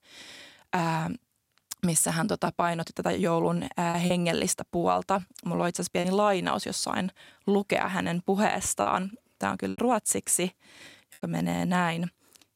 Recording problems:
choppy; occasionally; 3% of the speech affected

